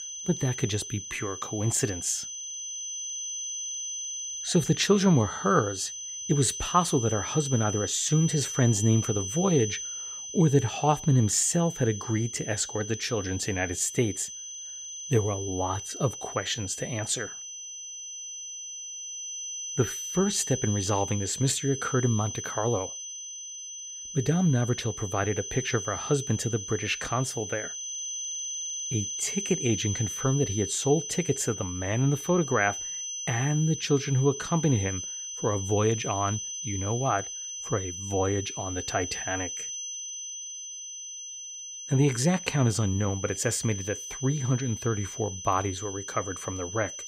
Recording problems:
high-pitched whine; loud; throughout; 6 kHz, 7 dB below the speech

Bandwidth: 15.5 kHz